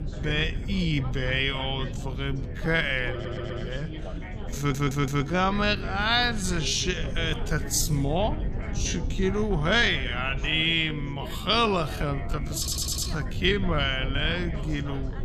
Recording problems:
wrong speed, natural pitch; too slow; 0.5 times normal speed
background chatter; noticeable; throughout; 4 voices, 15 dB below the speech
low rumble; faint; throughout; 20 dB below the speech
audio stuttering; at 3 s, at 4.5 s and at 13 s

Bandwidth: 15 kHz